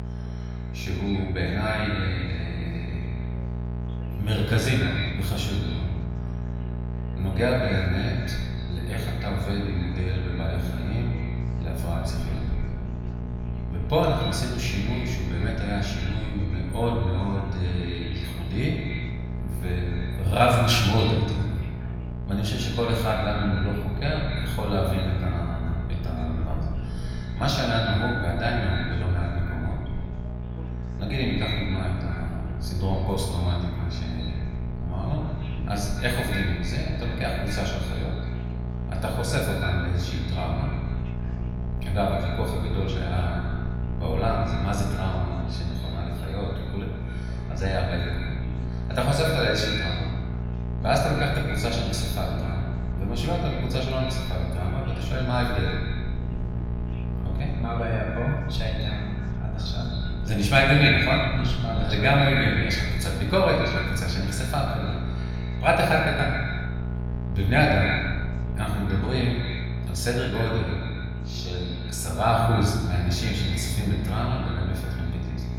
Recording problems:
echo of what is said; strong; throughout; 130 ms later, 8 dB below the speech
off-mic speech; far
room echo; noticeable; dies away in 1 s
electrical hum; noticeable; throughout; 60 Hz, 15 dB below the speech
chatter from many people; faint; throughout; 25 dB below the speech
low rumble; faint; from 12 s to 1:09; 25 dB below the speech

